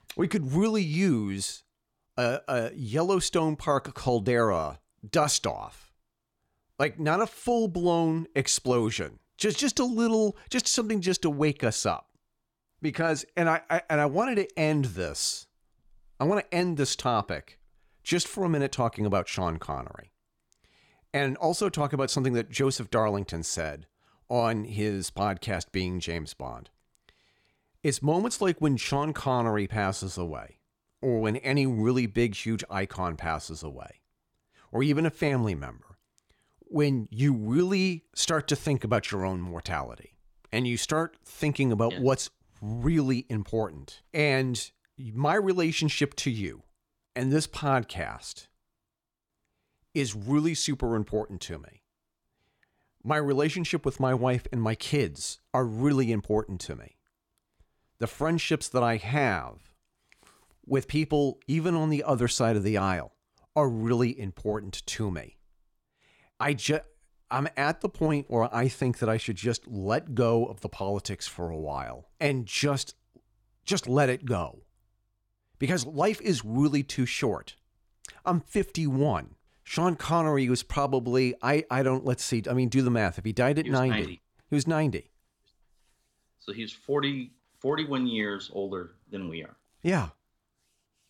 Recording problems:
none

